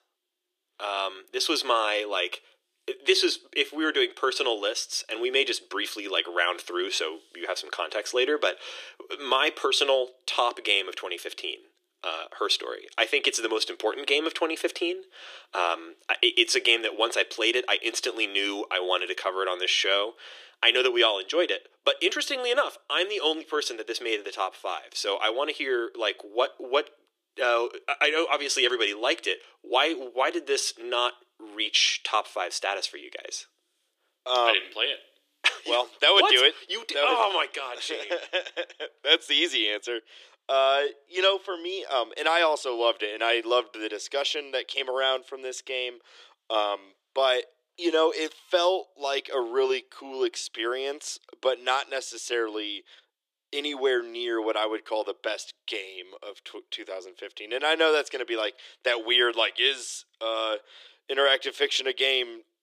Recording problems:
thin; very; fading below 350 Hz

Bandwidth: 15 kHz